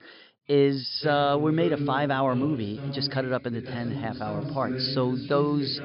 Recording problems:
high frequencies cut off; noticeable; nothing above 5.5 kHz
voice in the background; loud; throughout; 9 dB below the speech

